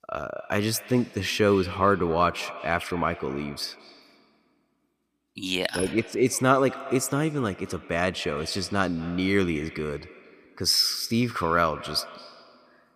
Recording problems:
echo of what is said; noticeable; throughout; 220 ms later, 15 dB below the speech

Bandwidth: 15 kHz